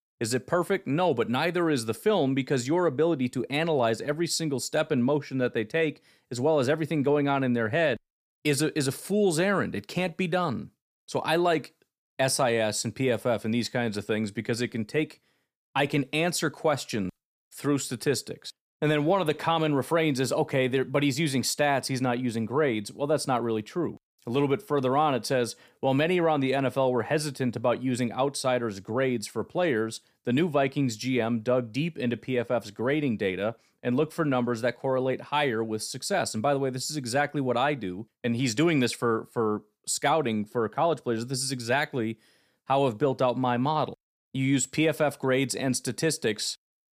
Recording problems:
none

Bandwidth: 15 kHz